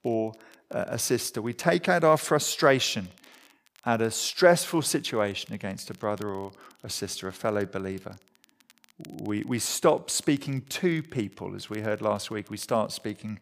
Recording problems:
crackle, like an old record; faint; 30 dB below the speech

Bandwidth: 15 kHz